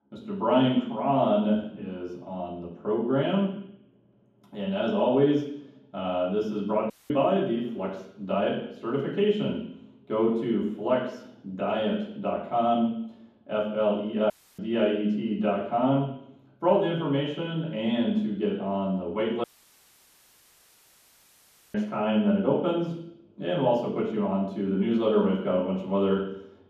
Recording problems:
off-mic speech; far
room echo; noticeable; dies away in 1.2 s
audio cutting out; at 7 s, at 14 s and at 19 s for 2.5 s

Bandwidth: 14.5 kHz